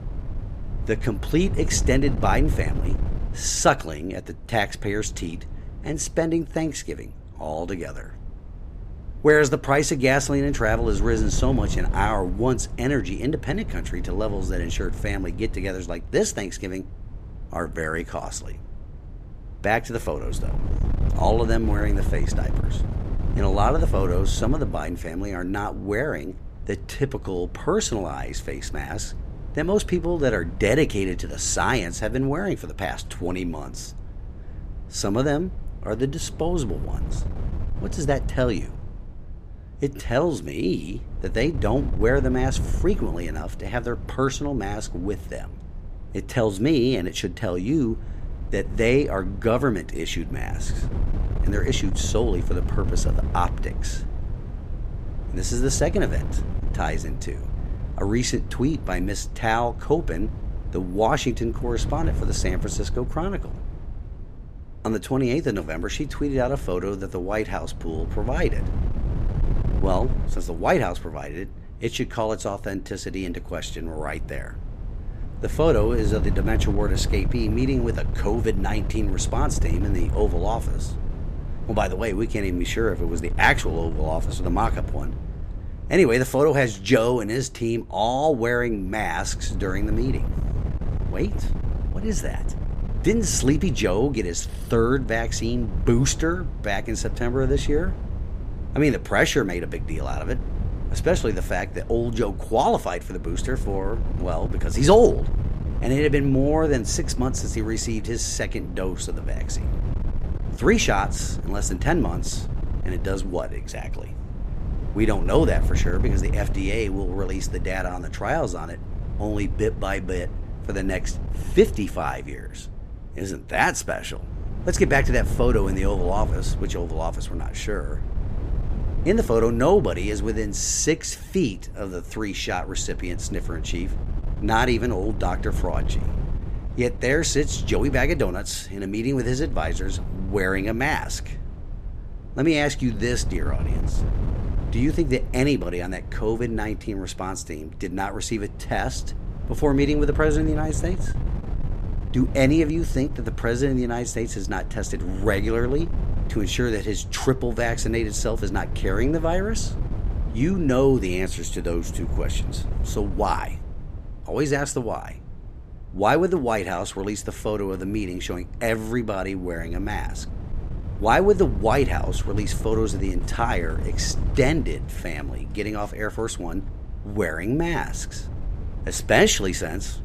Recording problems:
wind noise on the microphone; occasional gusts; 15 dB below the speech

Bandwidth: 14.5 kHz